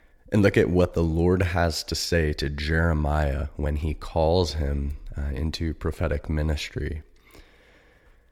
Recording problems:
uneven, jittery; strongly; from 0.5 to 7 s

